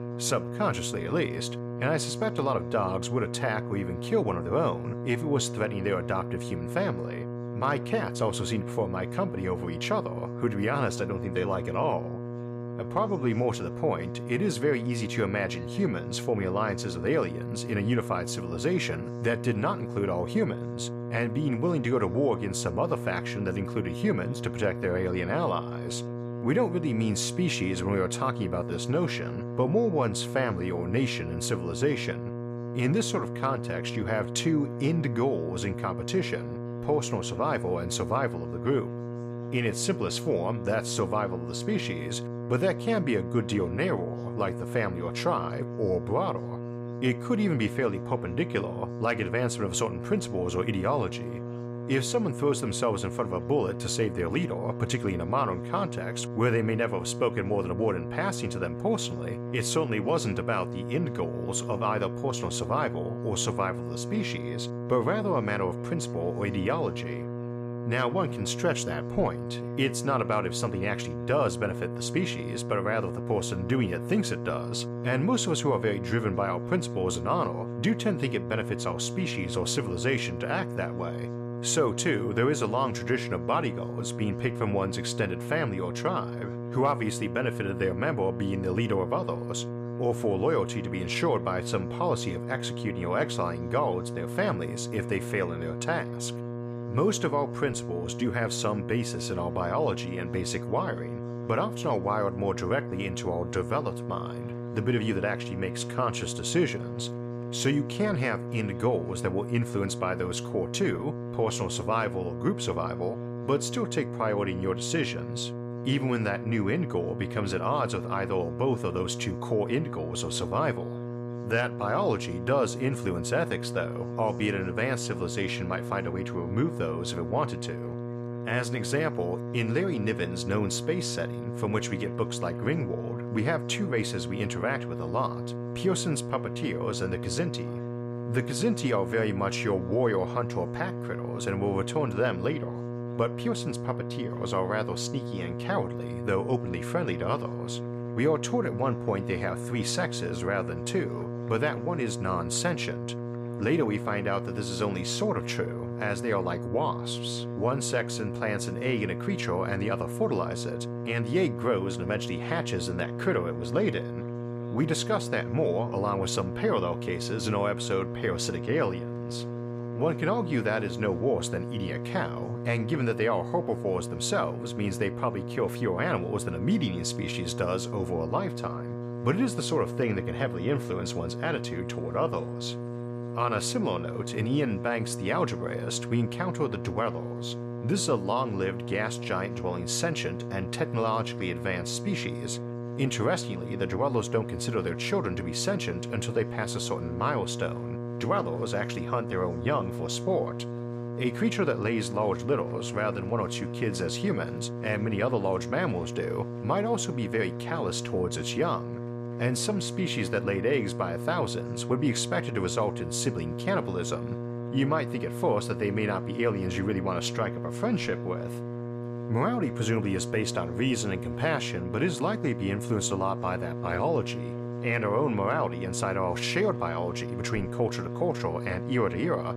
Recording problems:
electrical hum; loud; throughout; 60 Hz, 9 dB below the speech
chatter from many people; faint; throughout; 30 dB below the speech

